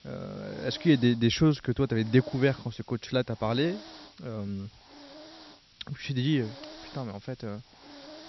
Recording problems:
high frequencies cut off; noticeable; nothing above 5.5 kHz
hiss; faint; throughout; 20 dB below the speech

